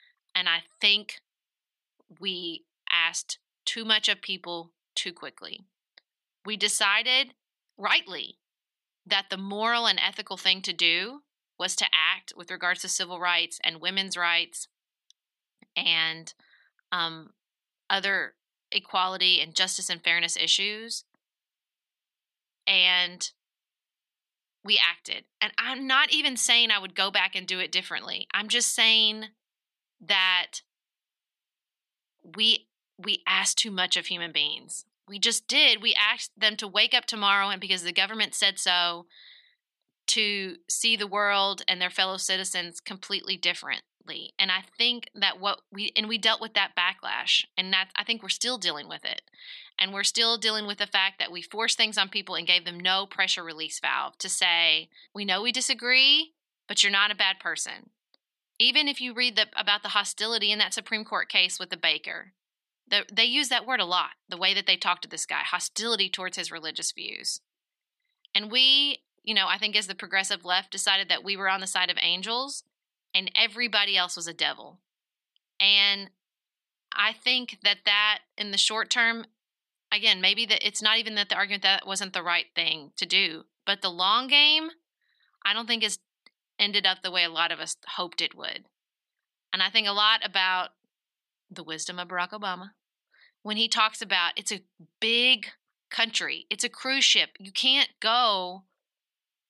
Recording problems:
thin; very; fading below 550 Hz

